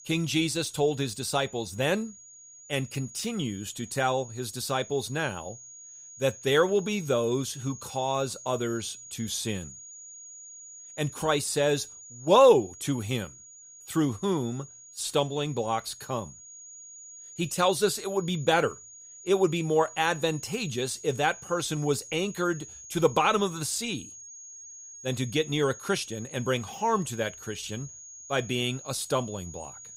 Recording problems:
high-pitched whine; noticeable; throughout; 6.5 kHz, 15 dB below the speech

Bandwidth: 15.5 kHz